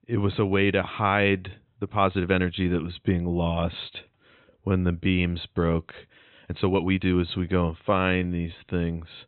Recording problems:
high frequencies cut off; severe; nothing above 4 kHz
uneven, jittery; strongly; from 2 to 8.5 s

